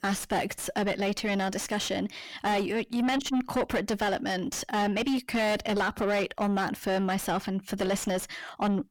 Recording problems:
distortion; heavy; 5 dB below the speech

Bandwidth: 17 kHz